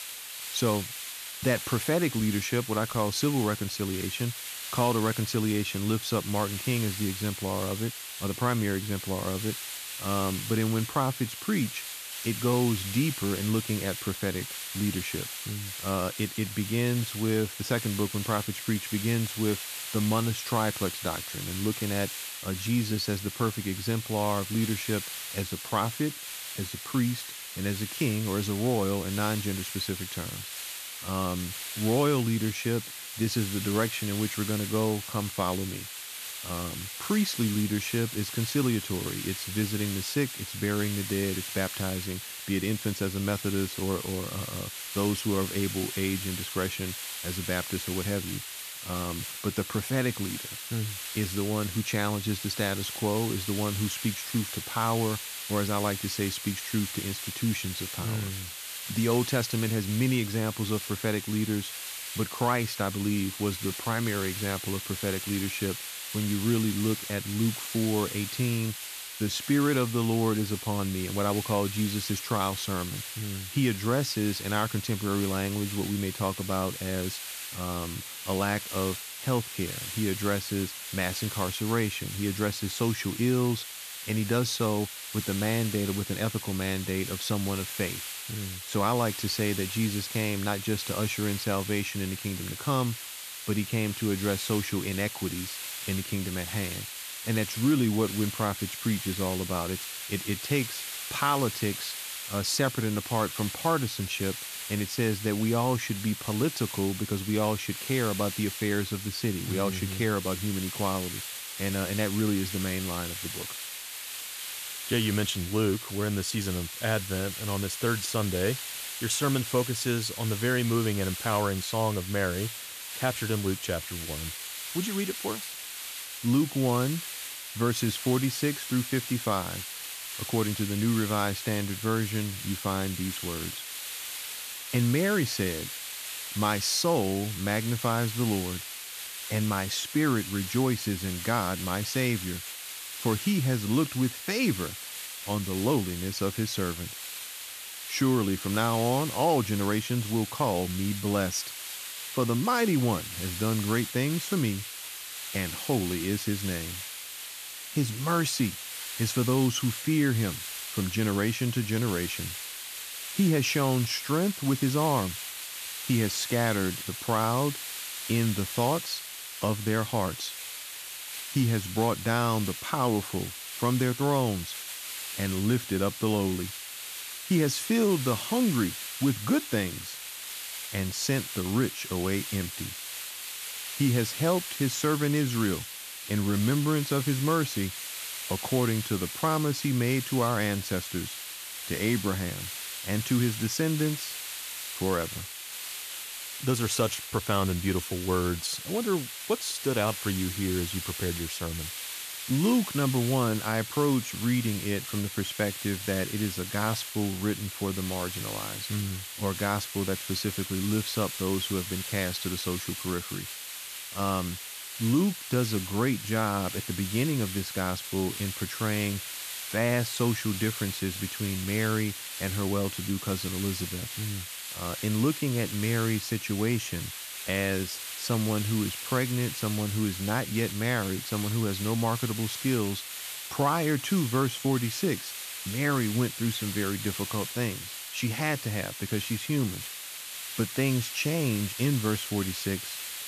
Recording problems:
hiss; loud; throughout; 6 dB below the speech

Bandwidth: 14.5 kHz